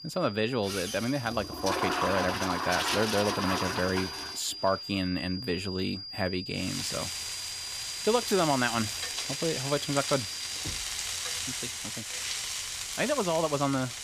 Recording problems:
high-pitched whine; loud; until 11 s; 5 kHz, 8 dB below the speech
household noises; loud; throughout; 2 dB below the speech
door banging; faint; at 11 s; peak 15 dB below the speech

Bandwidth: 15 kHz